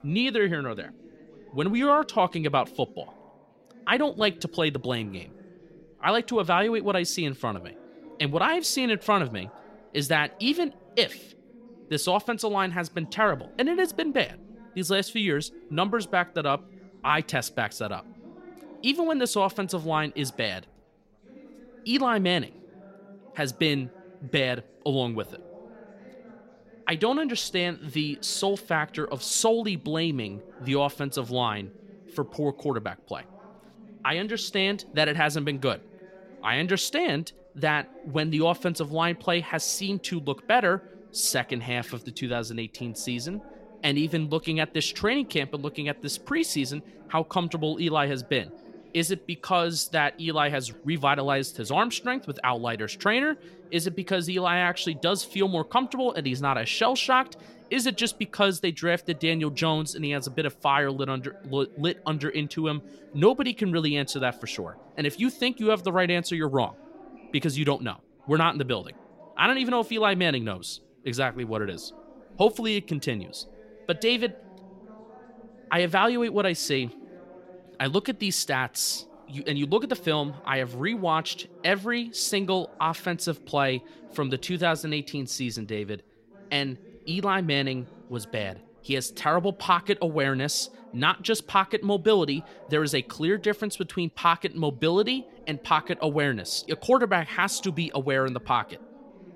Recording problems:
background chatter; faint; throughout; 4 voices, 25 dB below the speech

